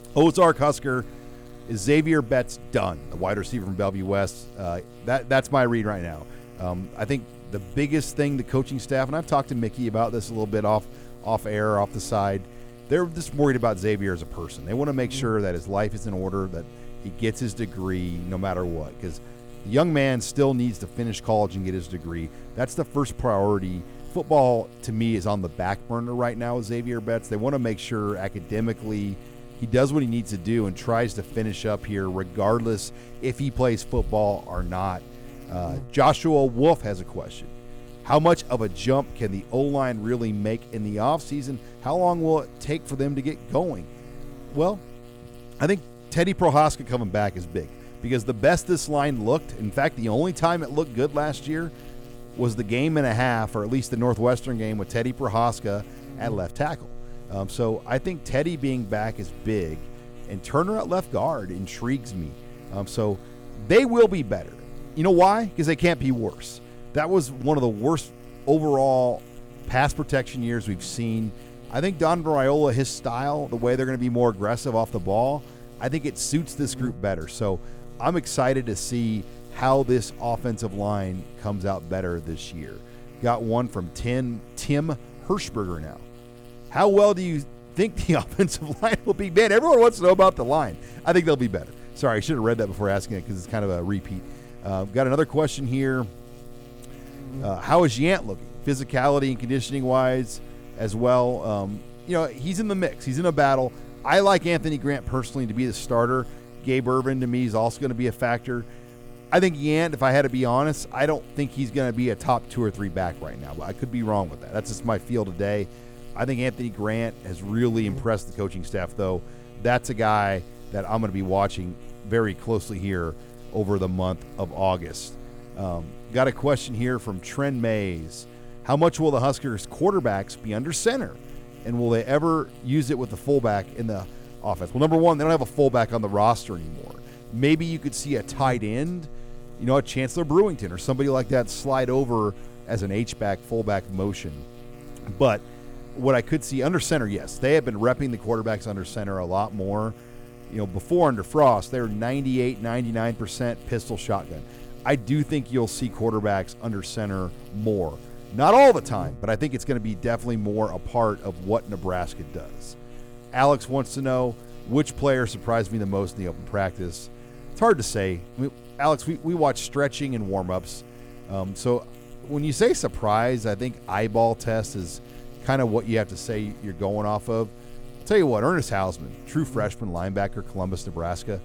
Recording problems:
electrical hum; faint; throughout; 60 Hz, 20 dB below the speech

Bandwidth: 18 kHz